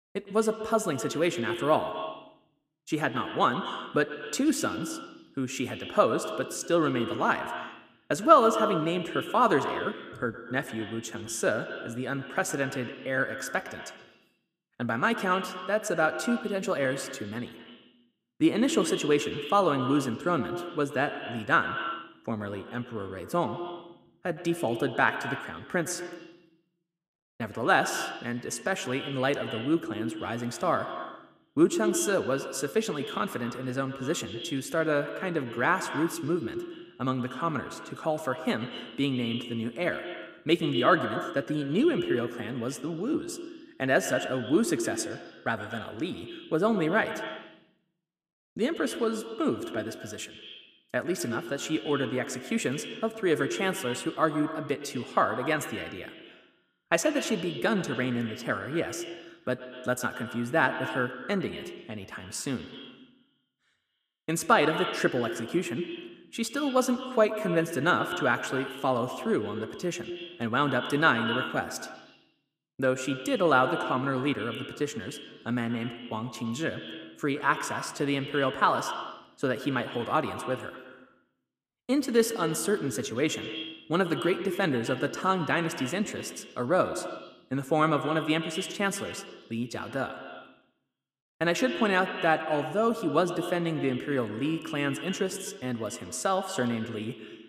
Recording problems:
echo of what is said; strong; throughout; 110 ms later, 8 dB below the speech

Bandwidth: 15 kHz